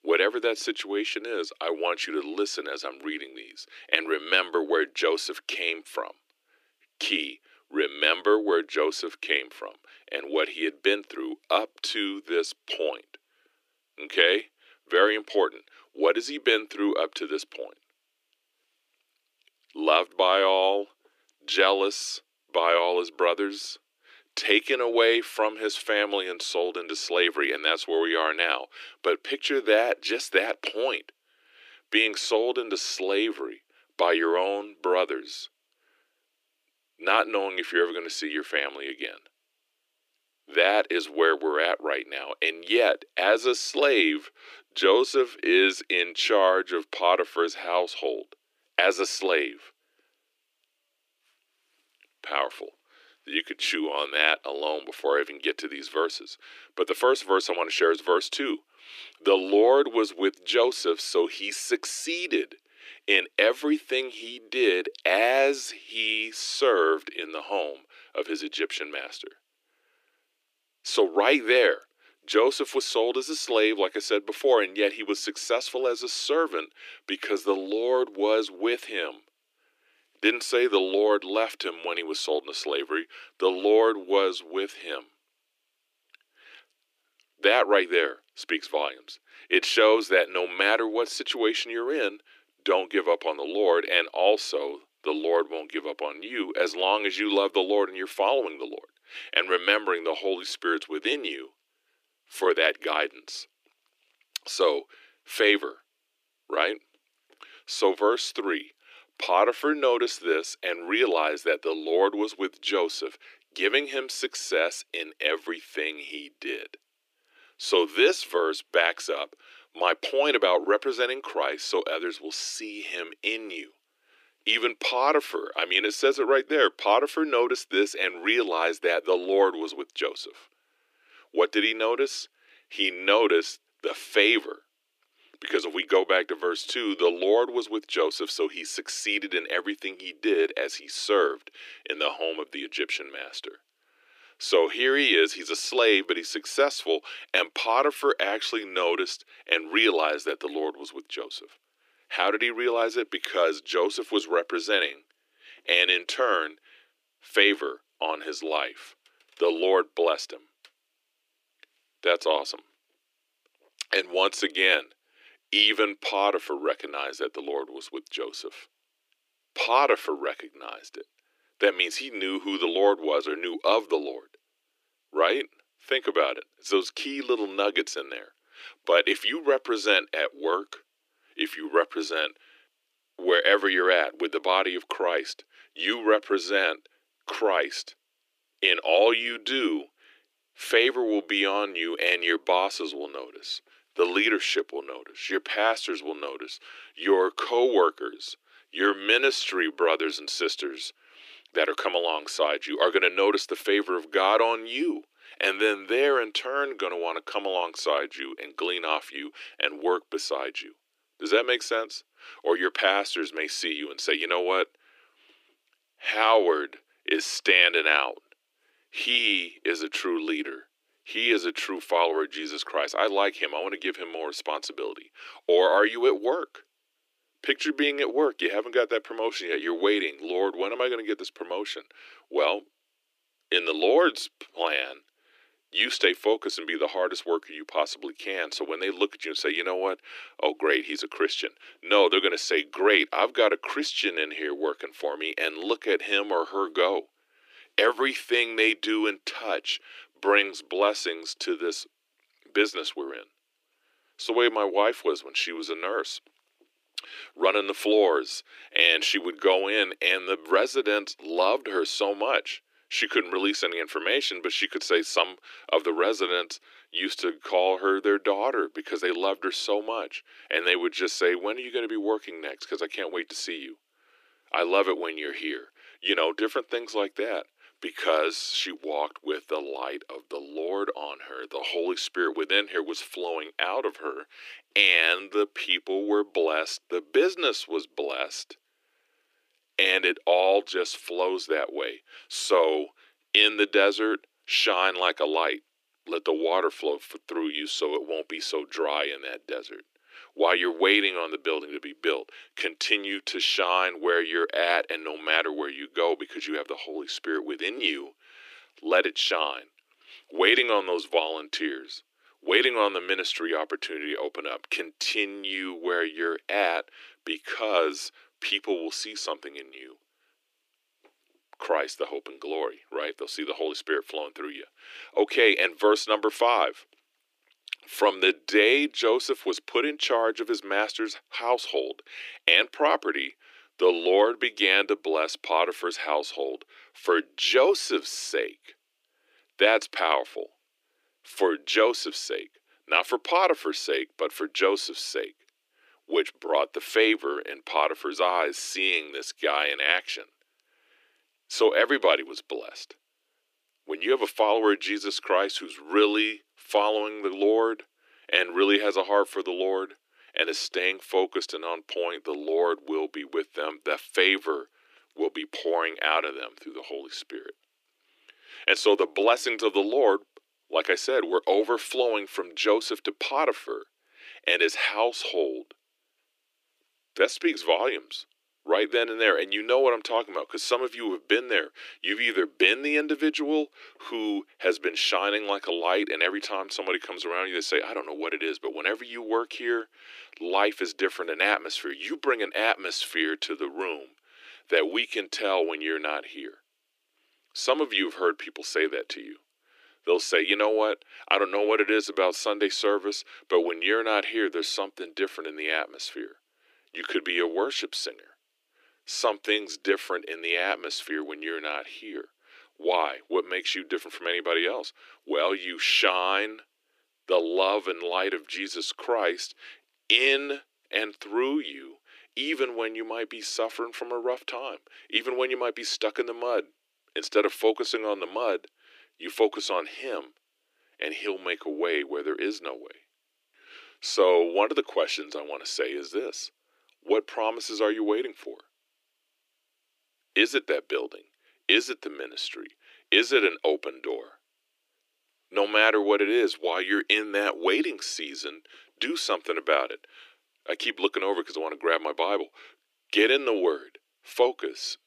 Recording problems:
thin; very; fading below 300 Hz

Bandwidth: 15 kHz